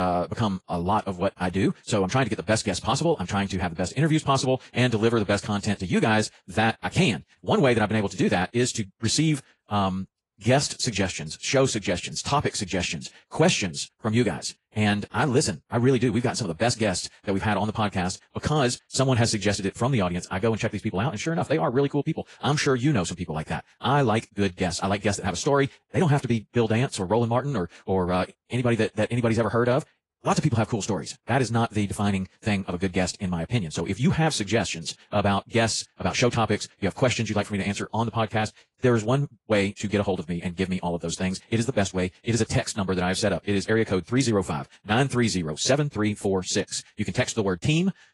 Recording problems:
wrong speed, natural pitch; too fast; 1.8 times normal speed
garbled, watery; slightly
abrupt cut into speech; at the start

